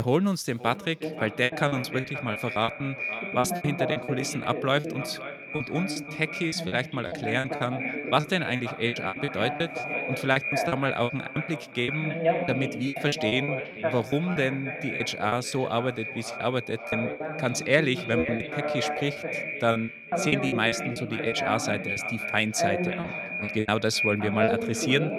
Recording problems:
echo of what is said; strong; throughout; 530 ms later, 6 dB below the speech
voice in the background; loud; throughout; 6 dB below the speech
choppy; very; 15% of the speech affected
abrupt cut into speech; at the start

